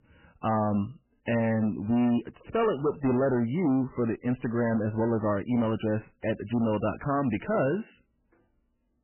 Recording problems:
garbled, watery; badly; nothing above 3 kHz
distortion; slight; 11% of the sound clipped

